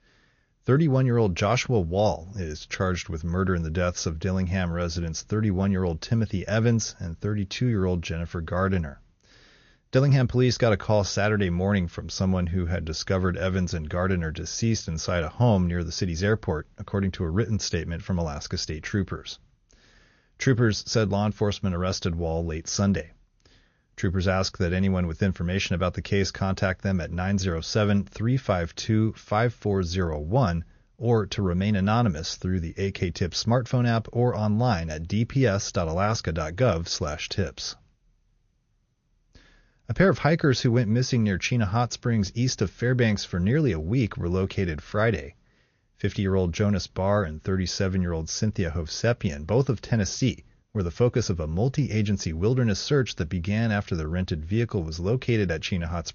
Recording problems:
garbled, watery; slightly; nothing above 6.5 kHz

